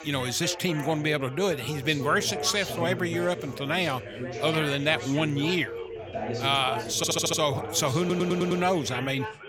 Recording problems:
background chatter; loud; throughout; 4 voices, 9 dB below the speech
audio stuttering; at 7 s and at 8 s

